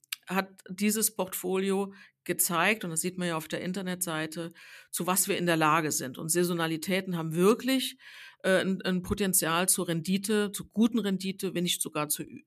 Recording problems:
none

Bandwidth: 14.5 kHz